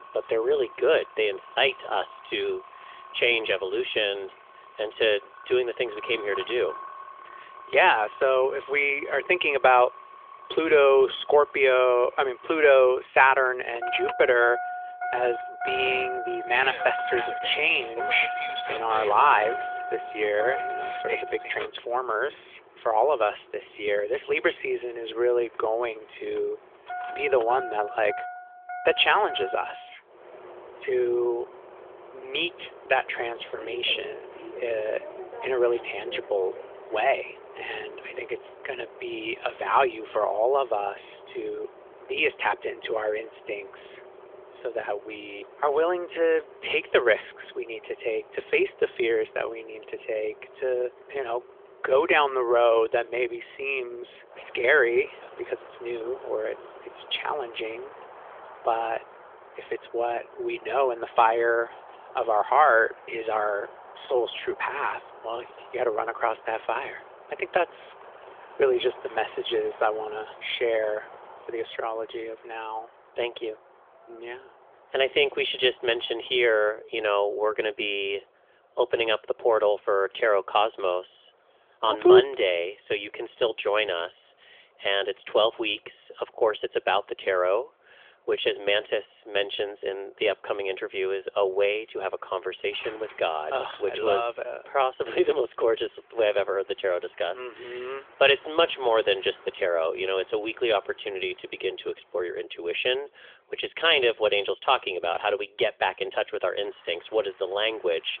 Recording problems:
phone-call audio; nothing above 3.5 kHz
traffic noise; noticeable; throughout; 15 dB below the speech

